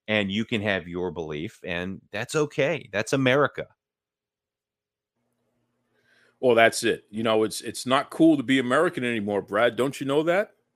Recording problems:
none

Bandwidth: 15 kHz